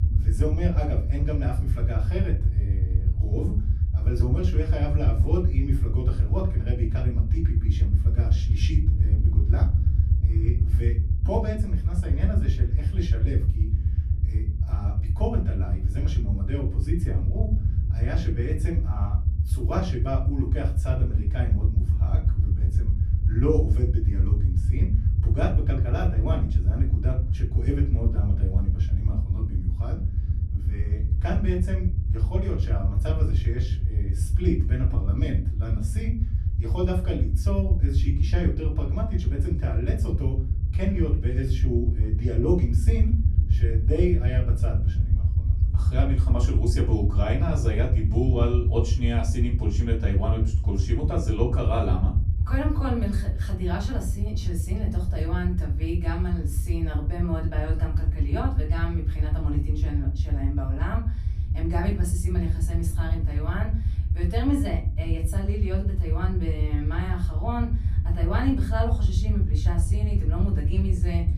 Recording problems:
off-mic speech; far
room echo; slight; dies away in 0.3 s
low rumble; loud; throughout; 7 dB below the speech

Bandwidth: 14.5 kHz